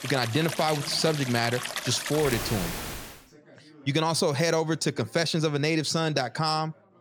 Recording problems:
rain or running water; loud; until 3 s; 7 dB below the speech
background chatter; faint; throughout; 4 voices, 30 dB below the speech

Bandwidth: 18.5 kHz